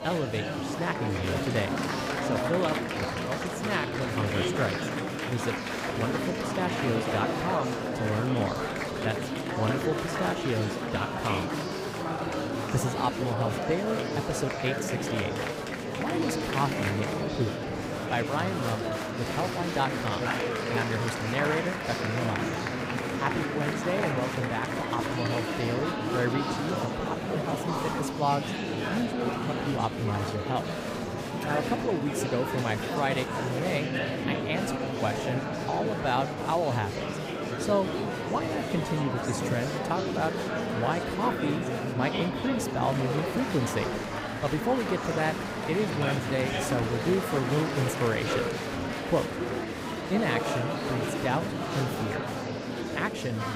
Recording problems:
murmuring crowd; very loud; throughout; 1 dB above the speech

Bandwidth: 15.5 kHz